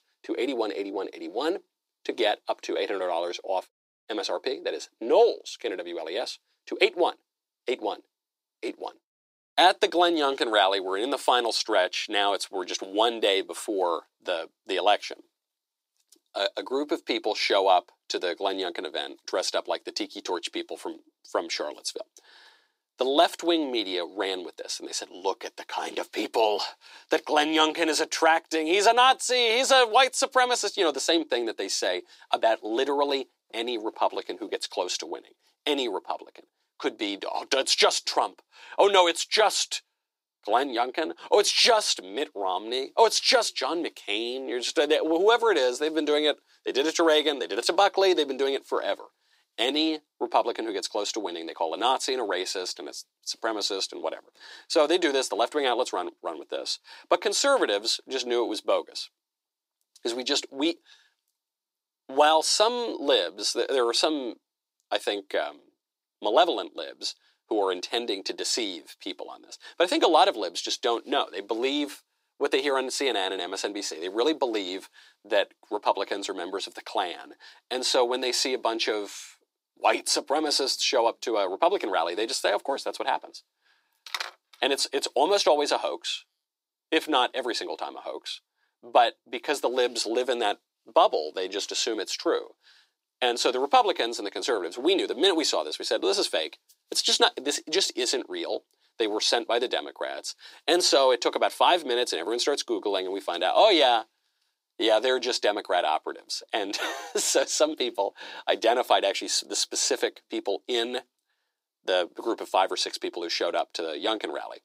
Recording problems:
thin; very; fading below 350 Hz

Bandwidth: 15.5 kHz